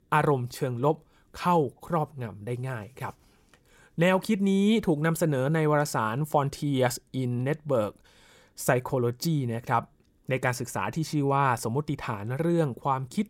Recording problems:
none

